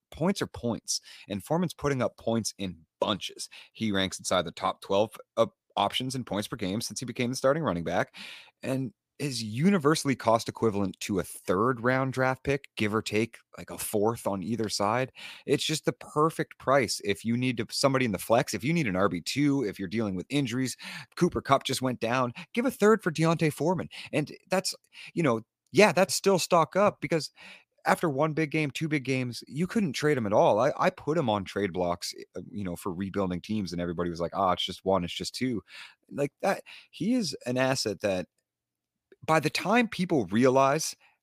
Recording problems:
none

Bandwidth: 15 kHz